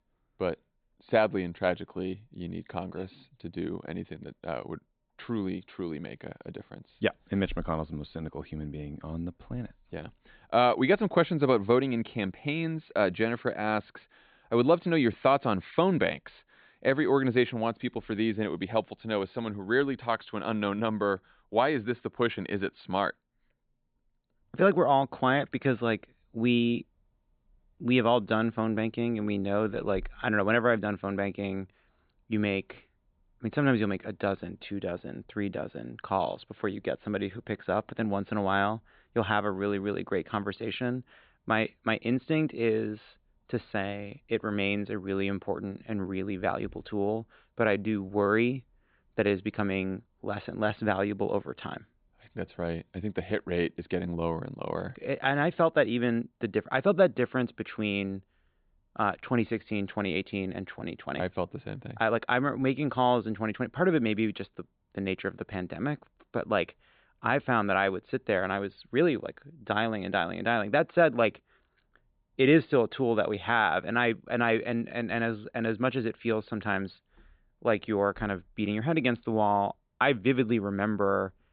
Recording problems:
high frequencies cut off; severe; nothing above 4 kHz

